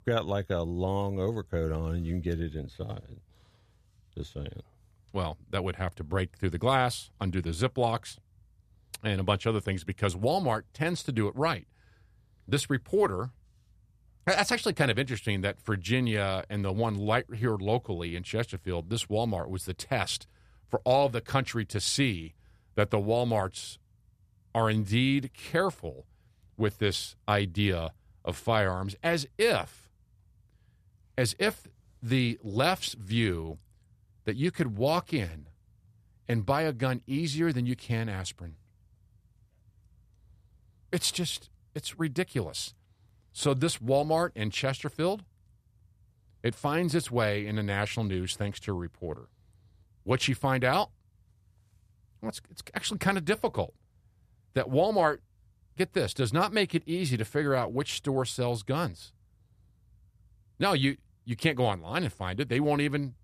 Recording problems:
none

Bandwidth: 14.5 kHz